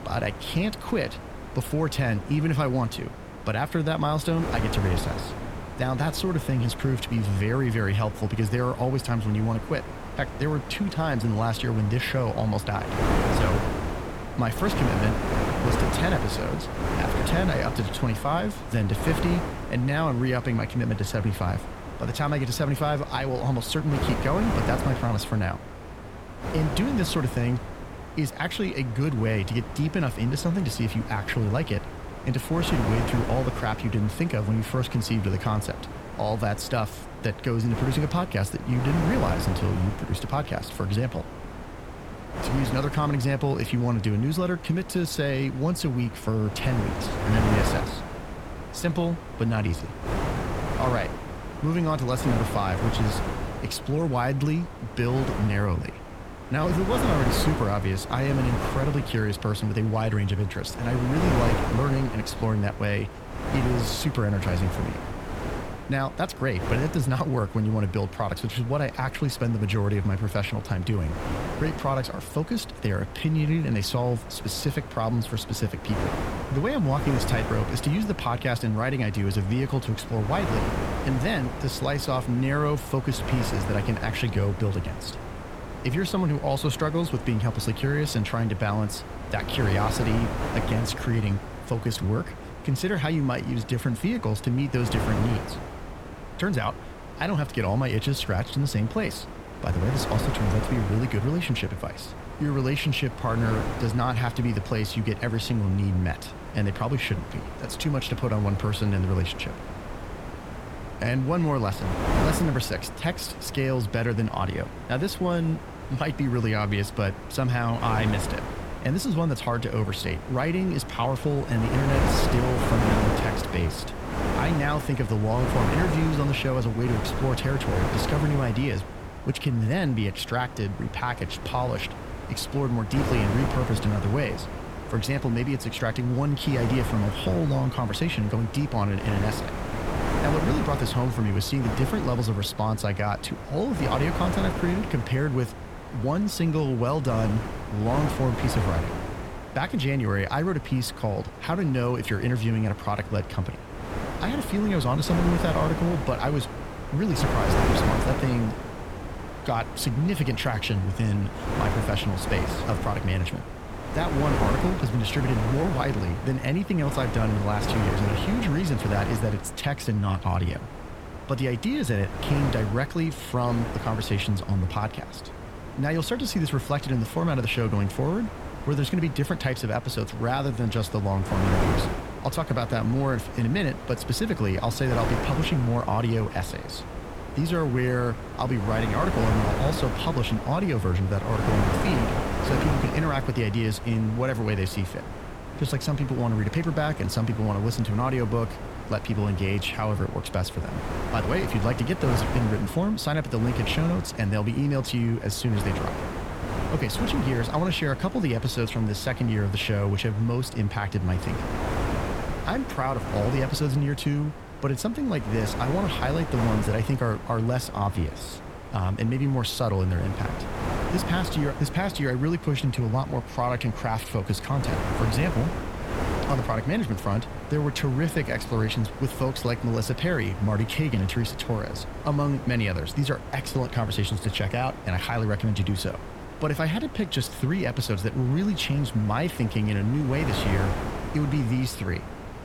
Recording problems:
wind noise on the microphone; heavy; 4 dB below the speech

